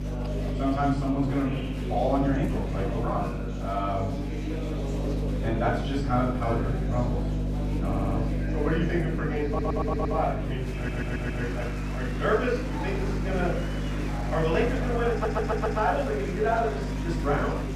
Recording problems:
off-mic speech; far
room echo; noticeable; dies away in 0.6 s
murmuring crowd; loud; throughout; 8 dB below the speech
electrical hum; noticeable; throughout; 50 Hz, 10 dB below the speech
audio stuttering; 4 times, first at 8 s

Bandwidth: 15 kHz